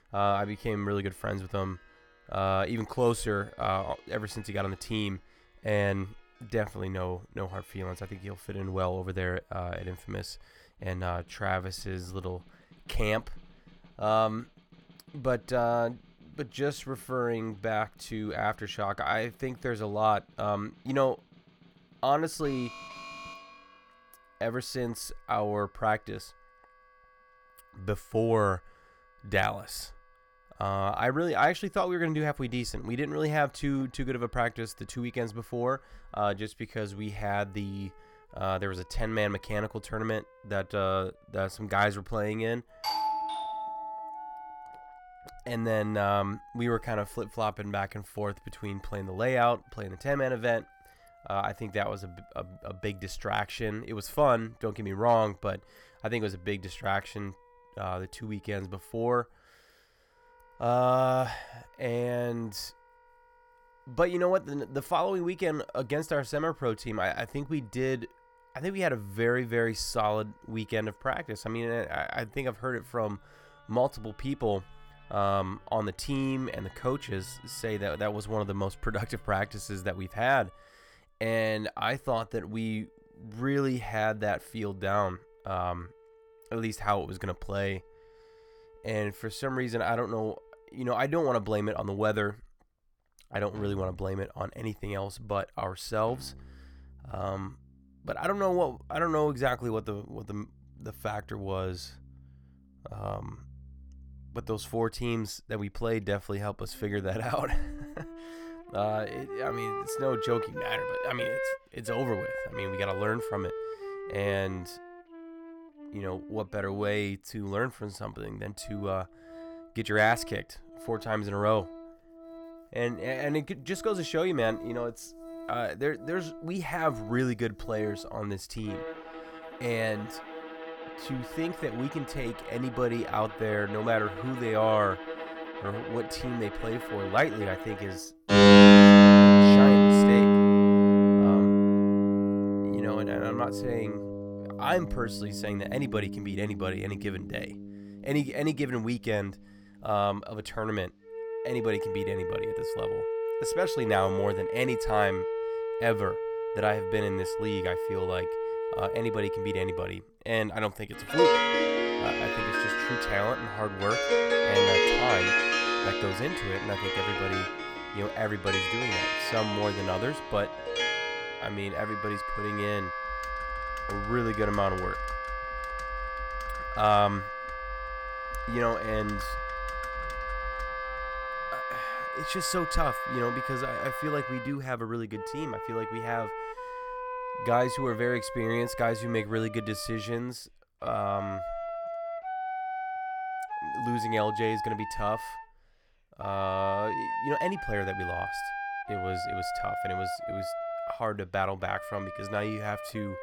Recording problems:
background music; very loud; throughout; 5 dB above the speech
alarm; faint; from 22 to 24 s; peak 10 dB below the speech
doorbell; loud; from 43 to 45 s; peak 2 dB above the speech
keyboard typing; faint; from 2:53 to 3:02; peak 10 dB below the speech

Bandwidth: 18 kHz